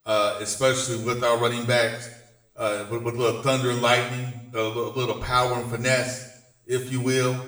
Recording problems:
off-mic speech; far
room echo; slight; dies away in 0.7 s

